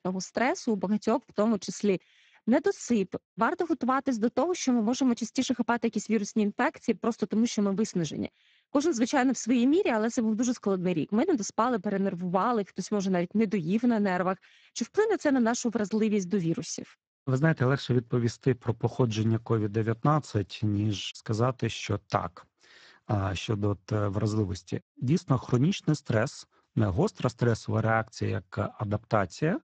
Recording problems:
garbled, watery; badly; nothing above 7.5 kHz

